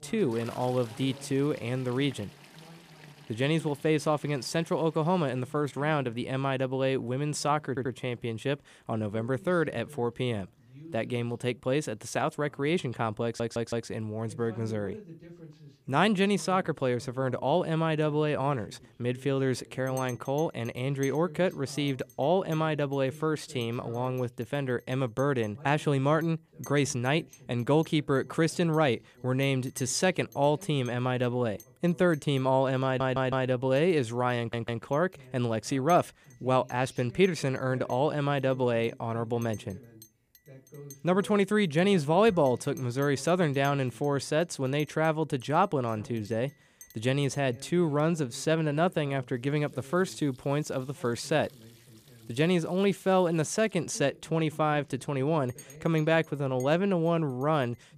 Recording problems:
household noises; faint; throughout; 25 dB below the speech
voice in the background; faint; throughout; 25 dB below the speech
audio stuttering; 4 times, first at 7.5 s

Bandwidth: 15 kHz